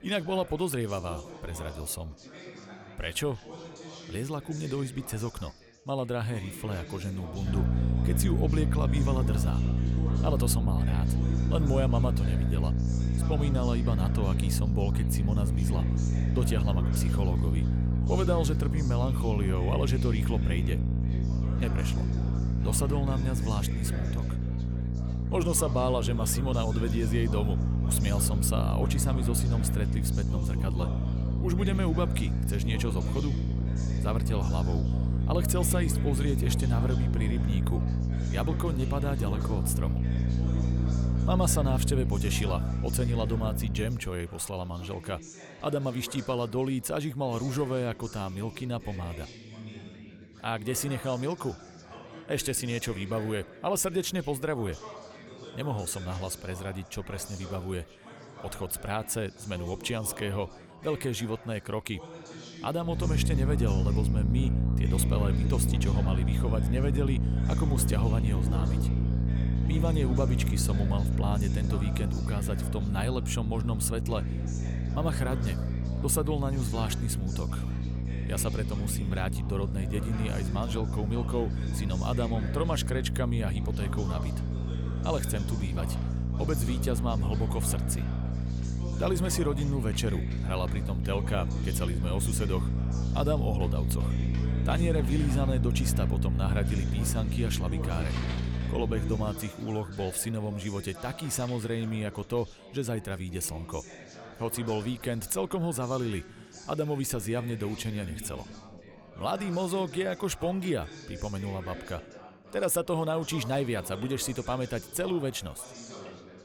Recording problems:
electrical hum; loud; from 7.5 to 44 s and from 1:03 to 1:39; 60 Hz, 6 dB below the speech
background chatter; noticeable; throughout; 4 voices, 15 dB below the speech
household noises; faint; from 1:10 on; 20 dB below the speech

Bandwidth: 18.5 kHz